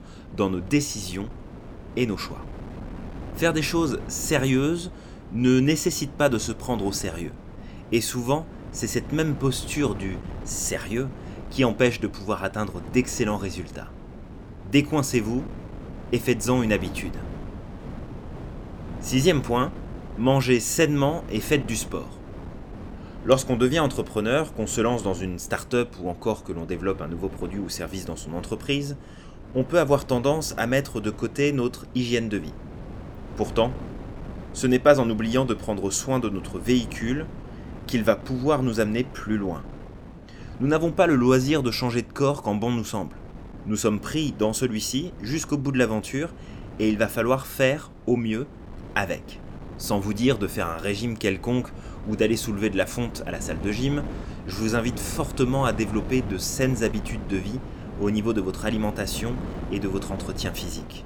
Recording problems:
wind noise on the microphone; occasional gusts; 15 dB below the speech

